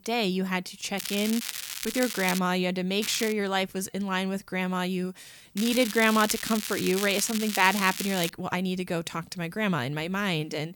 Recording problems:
crackling; loud; from 1 to 2.5 s, at 3 s and from 5.5 to 8.5 s; 6 dB below the speech

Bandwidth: 18 kHz